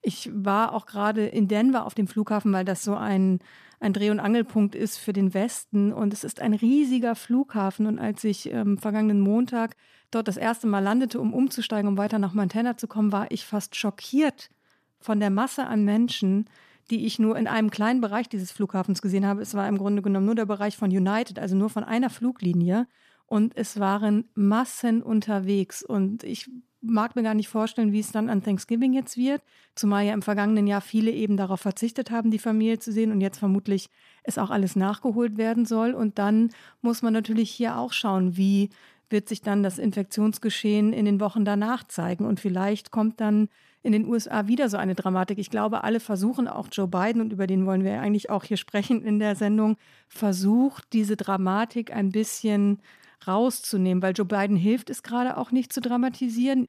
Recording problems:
none

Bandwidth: 14.5 kHz